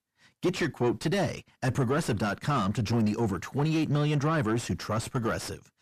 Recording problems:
distortion; heavy; 7 dB below the speech

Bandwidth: 14.5 kHz